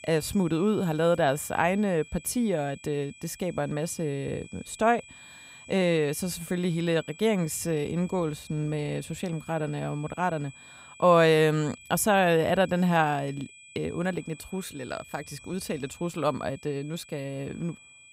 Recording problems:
high-pitched whine; faint; throughout; 2.5 kHz, 20 dB below the speech

